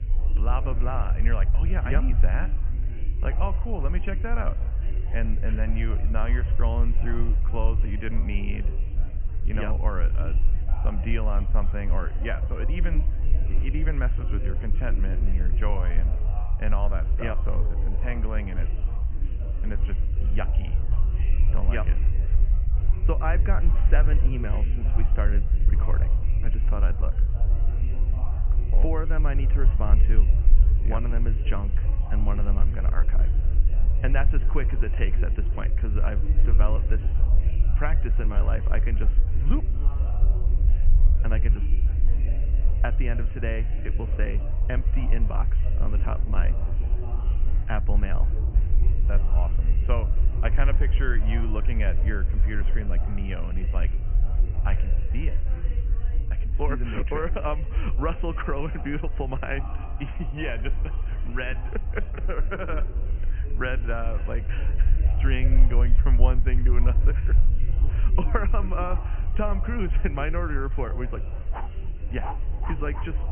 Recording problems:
high frequencies cut off; severe; nothing above 3 kHz
echo of what is said; faint; throughout; 270 ms later, 25 dB below the speech
chatter from many people; noticeable; throughout; 10 dB below the speech
low rumble; noticeable; throughout; 15 dB below the speech
rain or running water; faint; throughout; 25 dB below the speech

